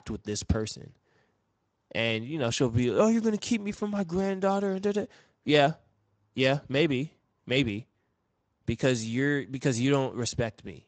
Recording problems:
garbled, watery; slightly; nothing above 8 kHz

